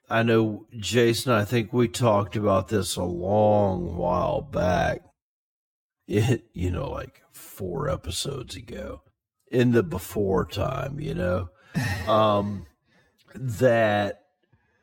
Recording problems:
wrong speed, natural pitch; too slow; 0.5 times normal speed

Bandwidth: 17 kHz